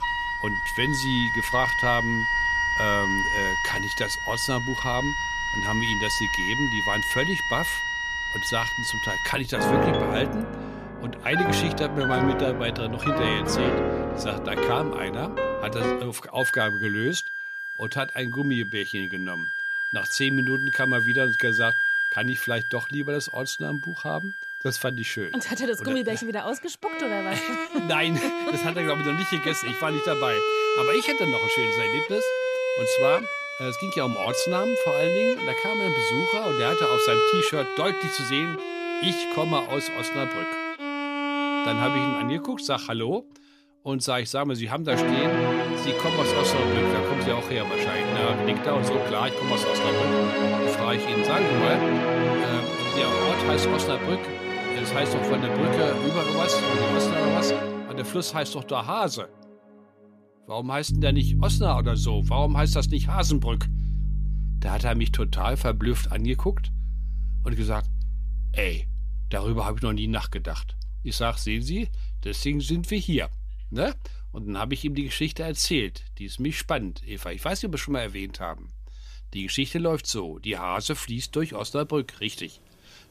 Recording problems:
background music; very loud; throughout; 3 dB above the speech

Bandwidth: 14.5 kHz